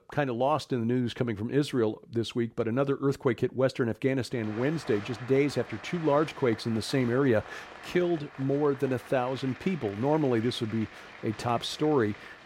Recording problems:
crowd noise; noticeable; from 4.5 s on; 15 dB below the speech

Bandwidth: 16 kHz